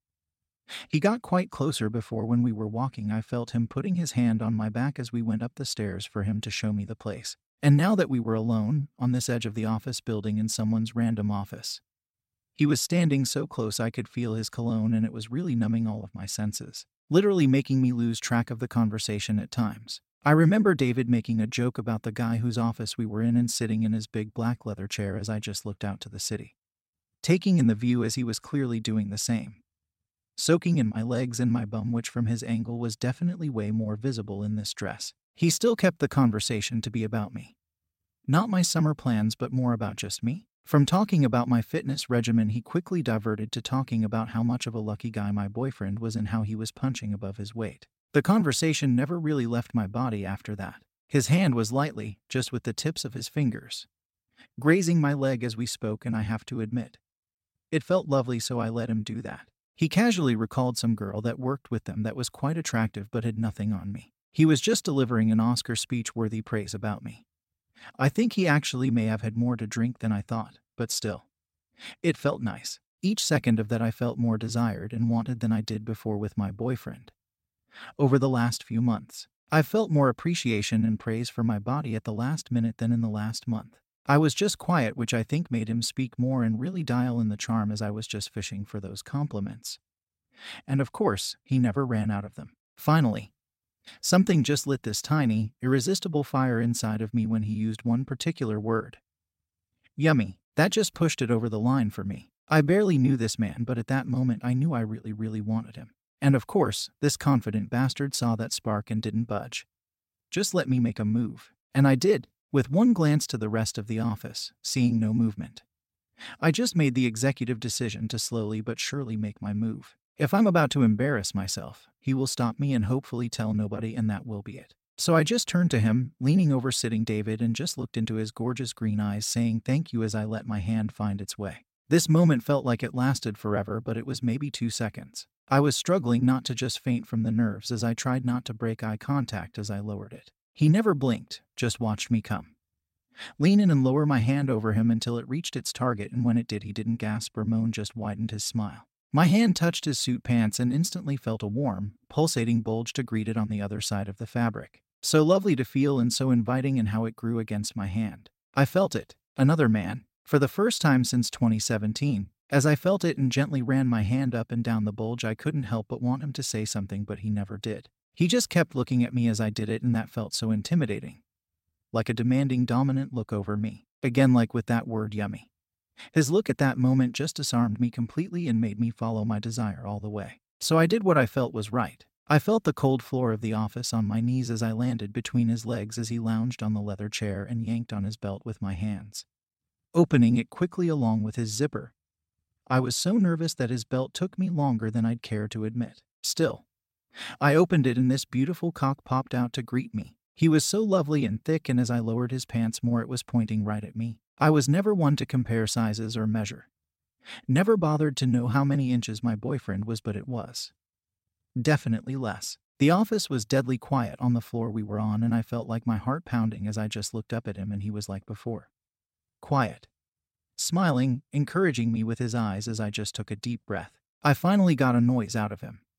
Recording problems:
none

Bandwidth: 16 kHz